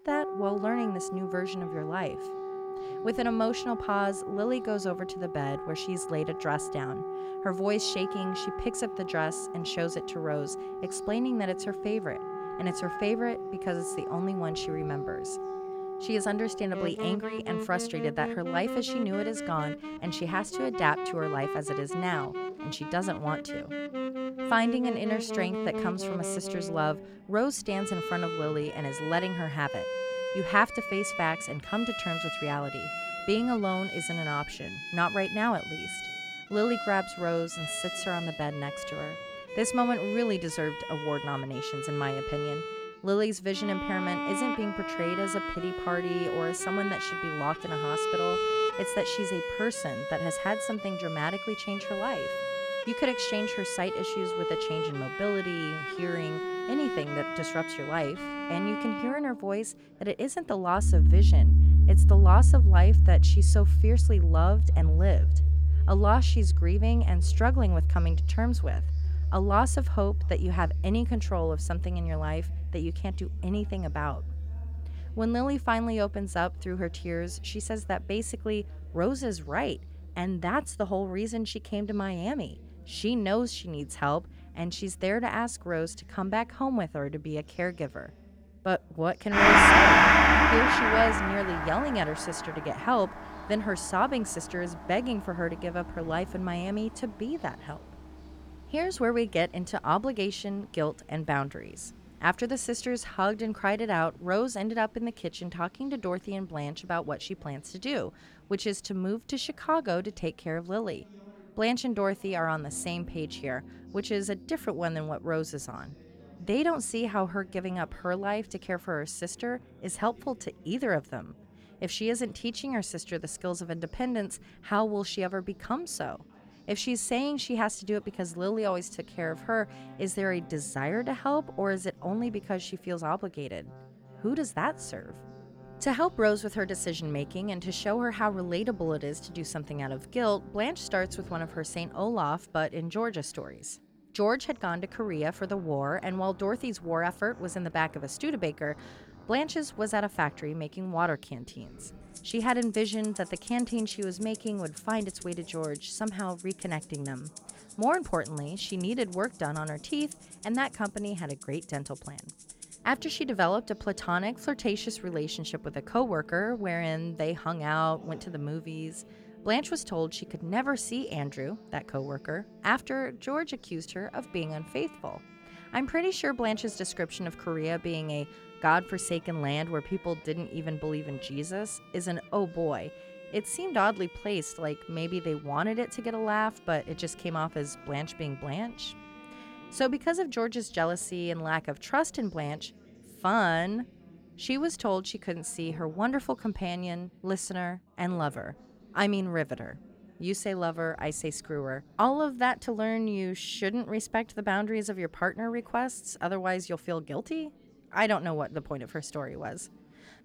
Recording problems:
background music; very loud; throughout; 3 dB above the speech
background chatter; faint; throughout; 3 voices, 25 dB below the speech

